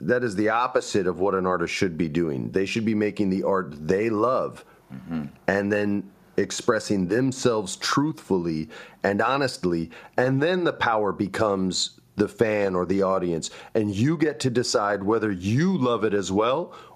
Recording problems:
squashed, flat; somewhat

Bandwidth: 14.5 kHz